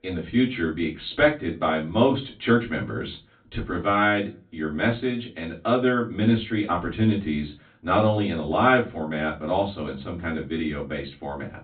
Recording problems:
off-mic speech; far
high frequencies cut off; severe; nothing above 4 kHz
room echo; very slight; dies away in 0.2 s

